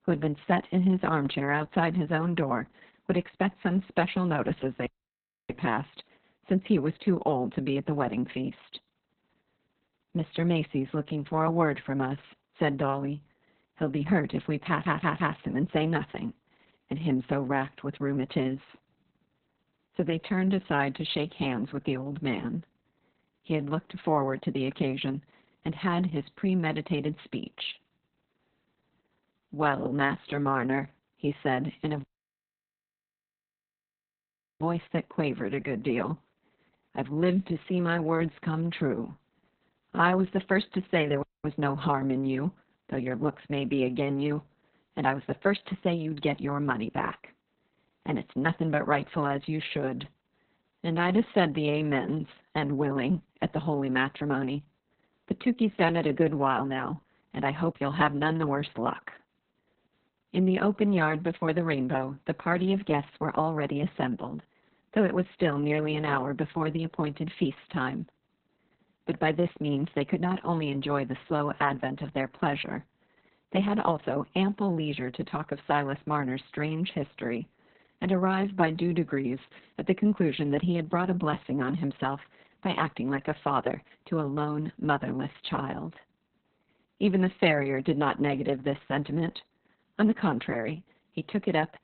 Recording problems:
garbled, watery; badly; nothing above 4 kHz
audio cutting out; at 5 s for 0.5 s, at 32 s for 2.5 s and at 41 s
audio stuttering; at 15 s

